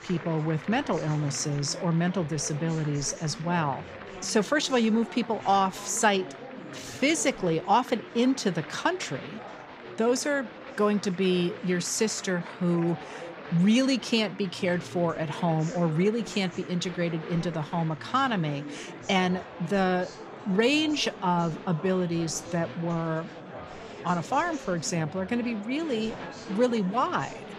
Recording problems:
murmuring crowd; noticeable; throughout; 15 dB below the speech

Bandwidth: 14.5 kHz